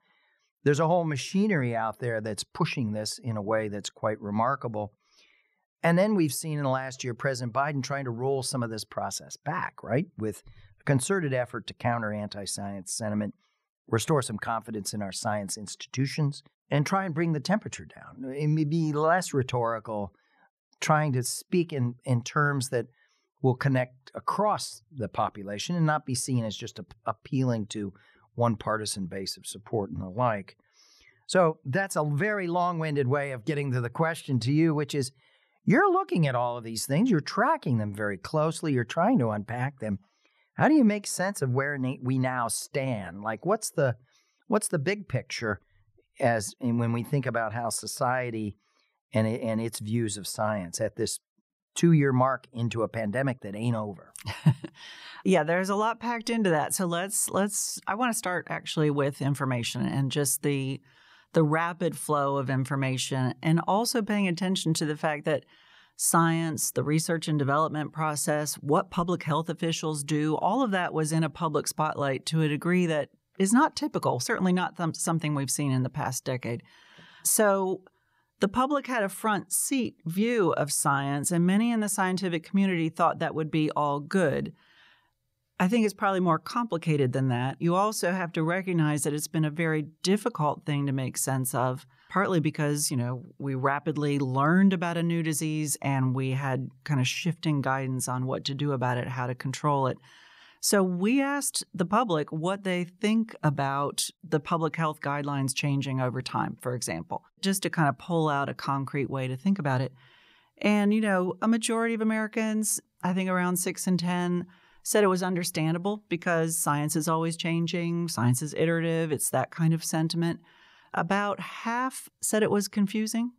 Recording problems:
none

